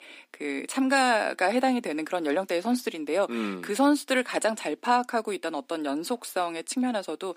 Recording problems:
thin; very slightly; fading below 250 Hz

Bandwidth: 15 kHz